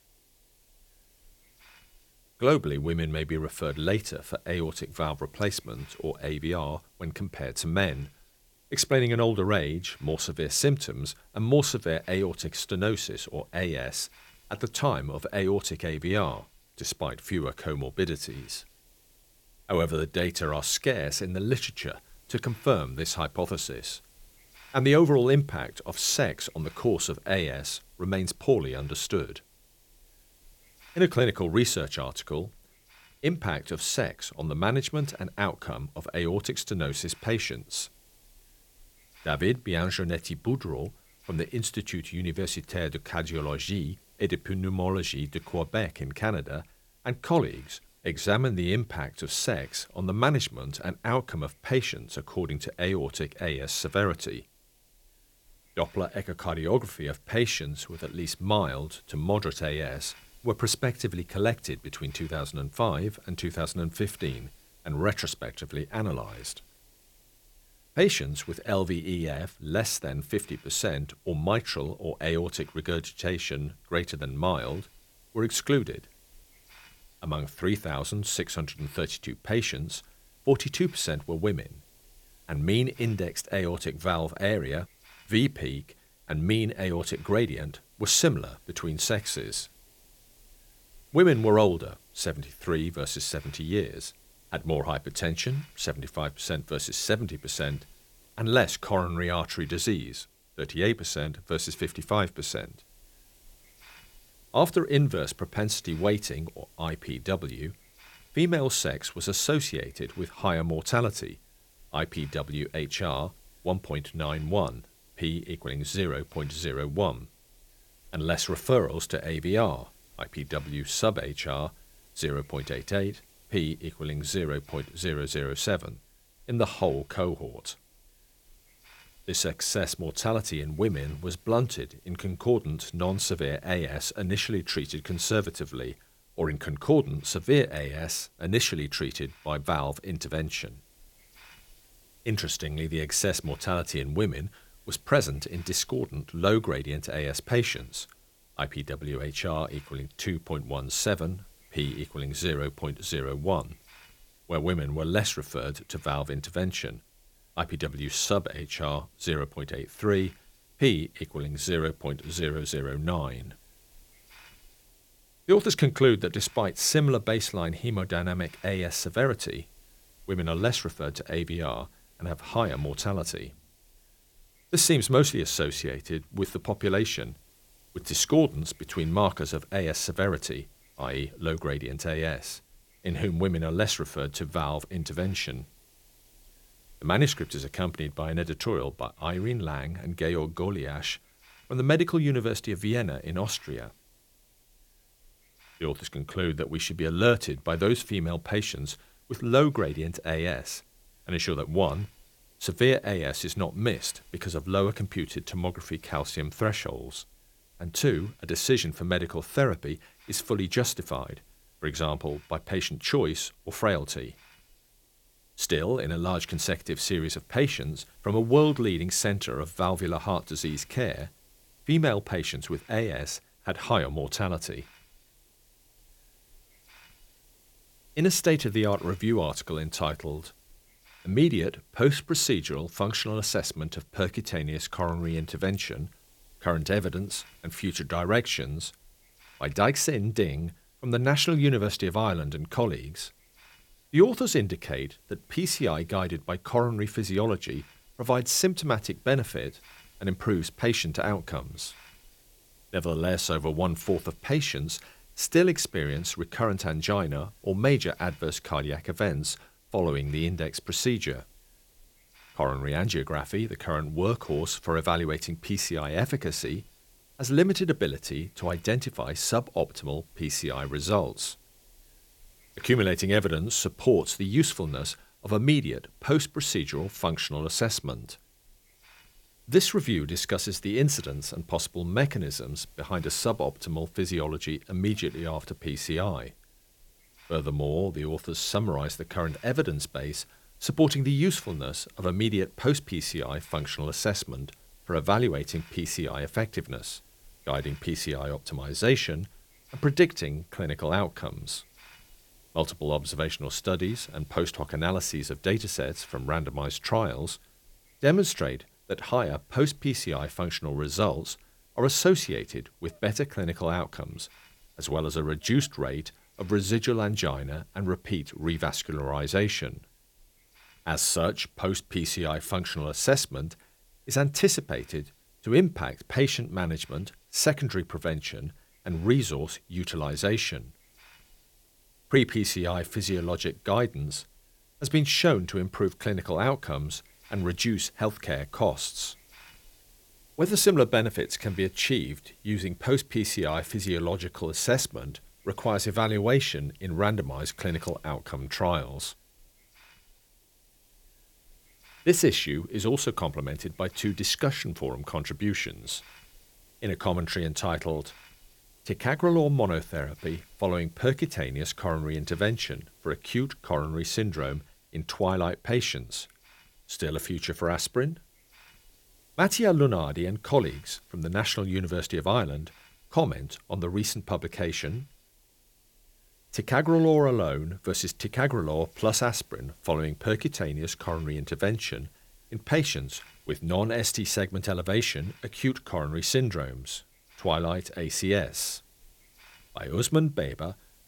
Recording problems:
hiss; faint; throughout; 30 dB below the speech

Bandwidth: 17 kHz